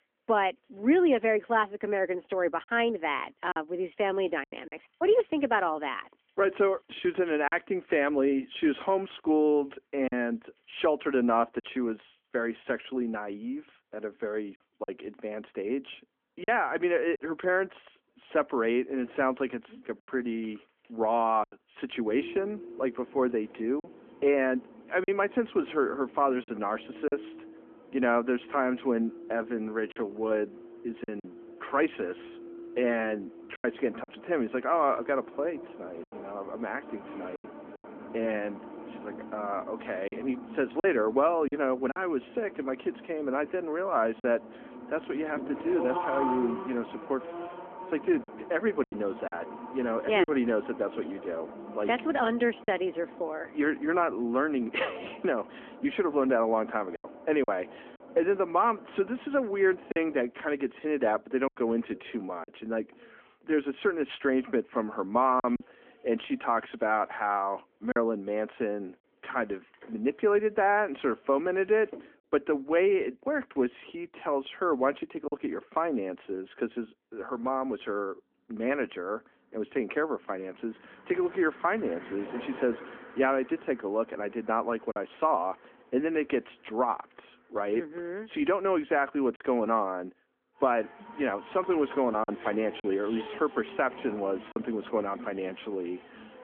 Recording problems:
phone-call audio; nothing above 3.5 kHz
traffic noise; noticeable; throughout; 15 dB below the speech
choppy; occasionally; 3% of the speech affected

